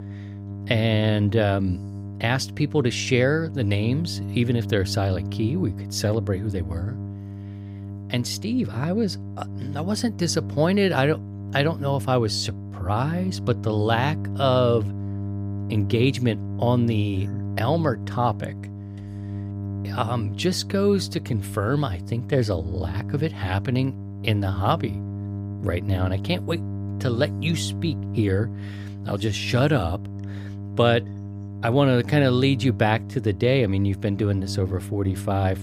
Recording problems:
electrical hum; noticeable; throughout; 50 Hz, 15 dB below the speech

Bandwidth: 15.5 kHz